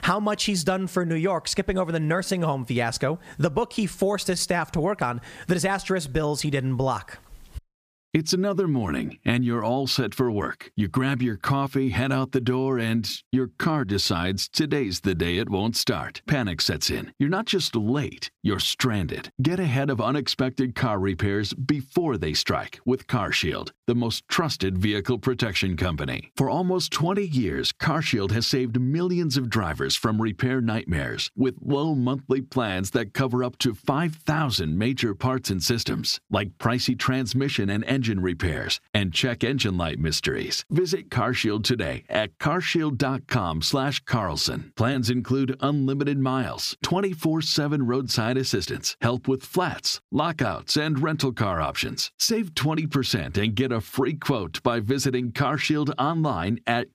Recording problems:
squashed, flat; somewhat

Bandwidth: 15 kHz